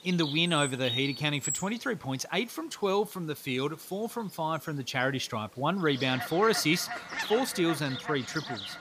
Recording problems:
animal sounds; loud; throughout; 6 dB below the speech

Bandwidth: 15 kHz